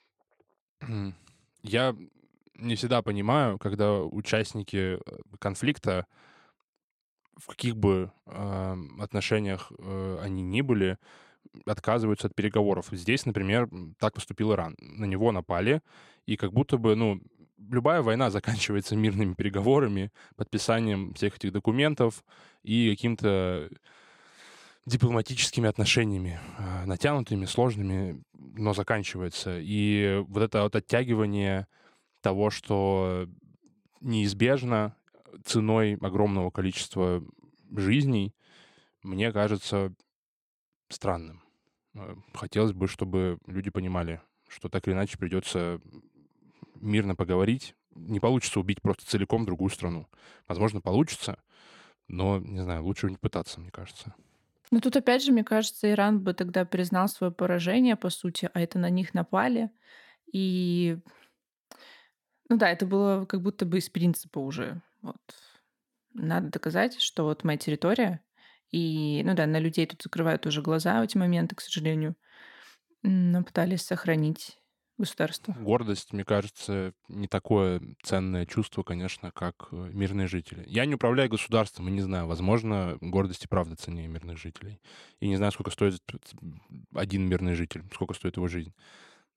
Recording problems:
none

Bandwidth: 18 kHz